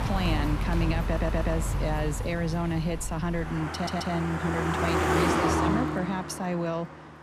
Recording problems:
traffic noise; very loud; throughout; 1 dB above the speech
audio stuttering; at 1 s and at 3.5 s

